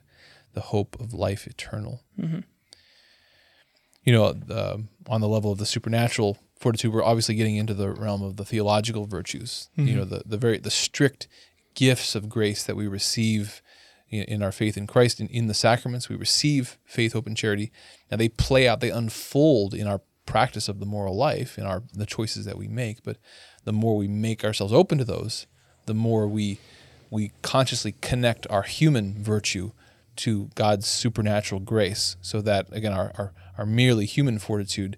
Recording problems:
none

